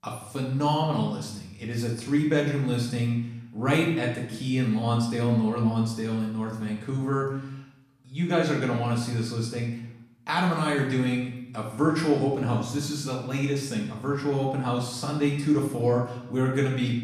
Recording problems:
off-mic speech; far
room echo; noticeable; dies away in 0.7 s

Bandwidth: 14.5 kHz